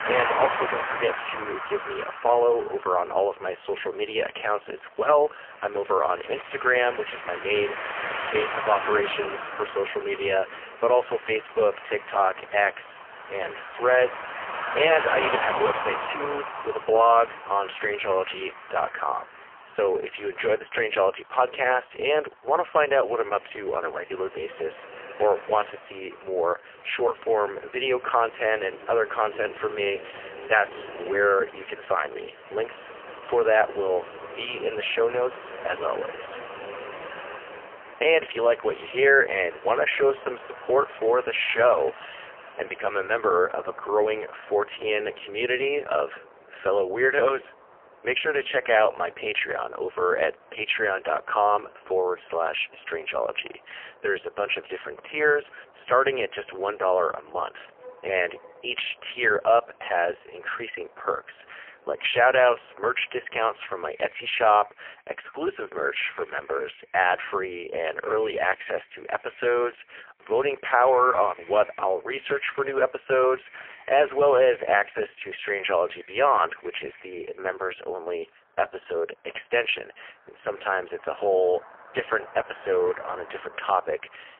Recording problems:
phone-call audio; poor line; nothing above 3 kHz
traffic noise; noticeable; throughout; 10 dB below the speech

